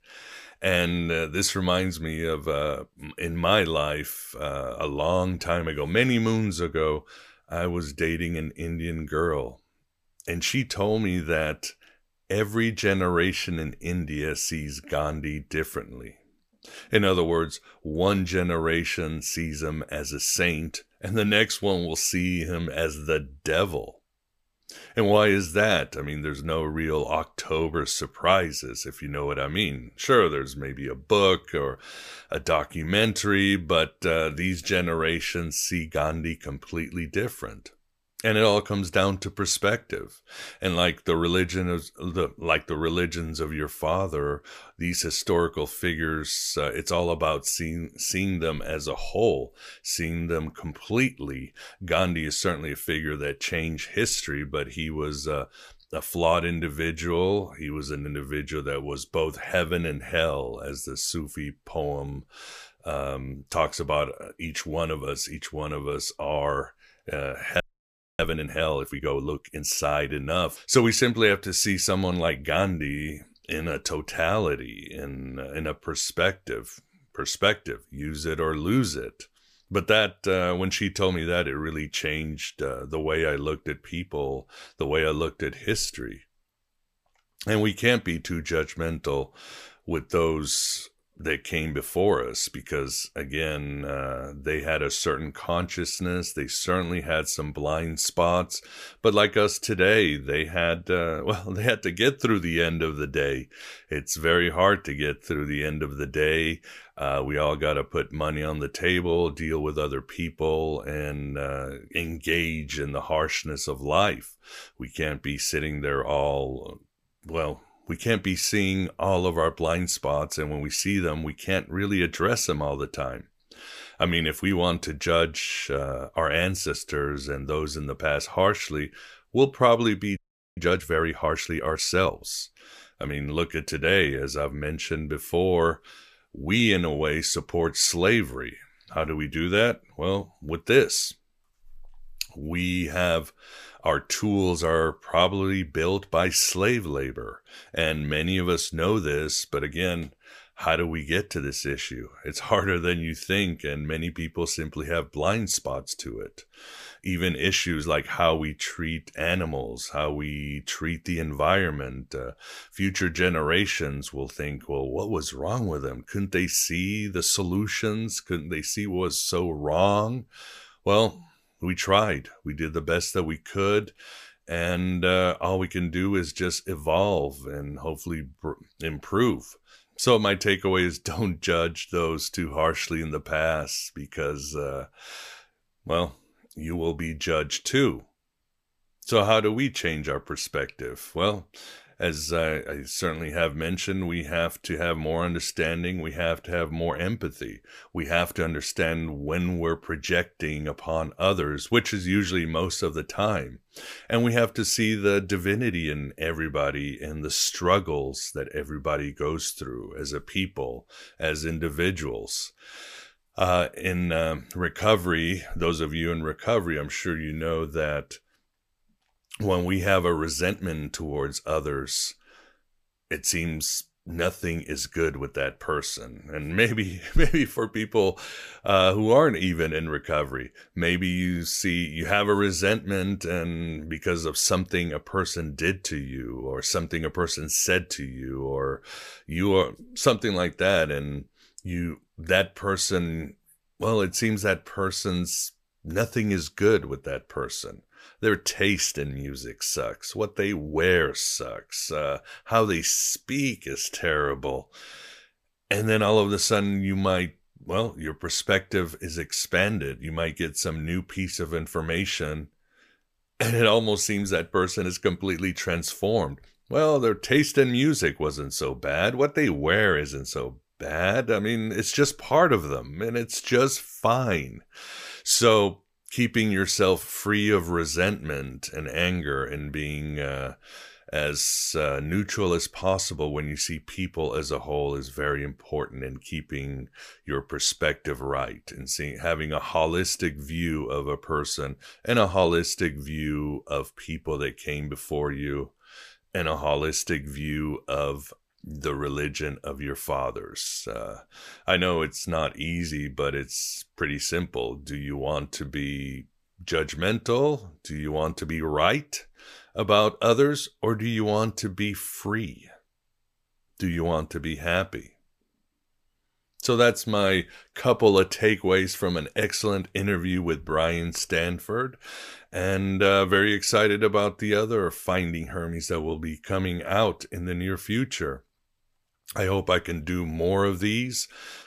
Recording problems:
audio freezing; at 1:08 for 0.5 s and at 2:10

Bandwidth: 14.5 kHz